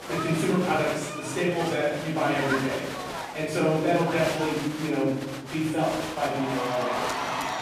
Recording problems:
off-mic speech; far
room echo; noticeable; dies away in 1 s
crowd noise; loud; throughout; 6 dB below the speech

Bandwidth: 14.5 kHz